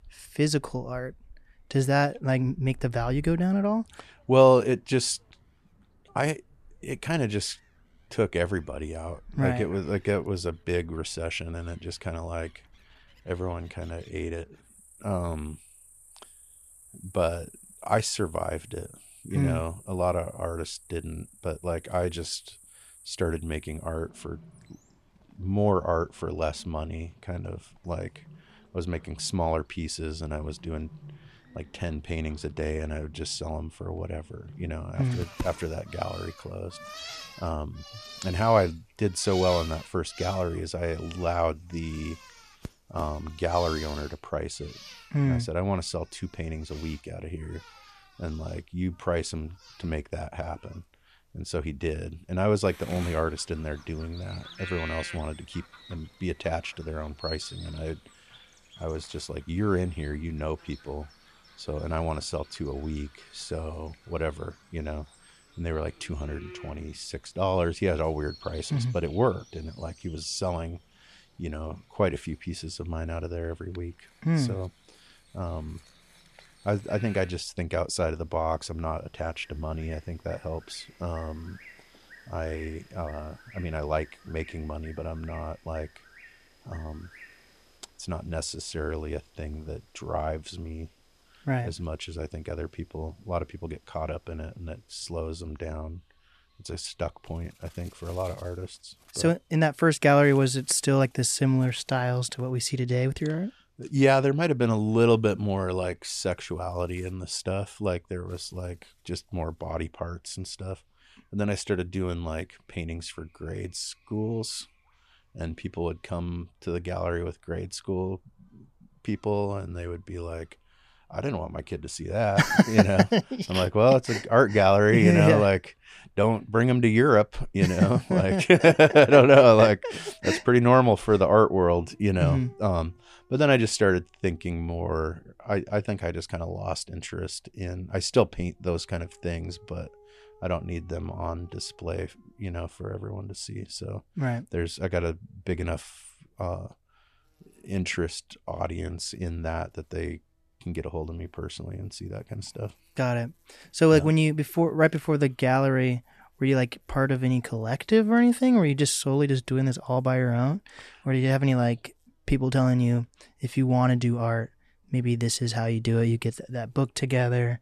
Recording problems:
animal sounds; faint; throughout; 20 dB below the speech

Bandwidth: 14 kHz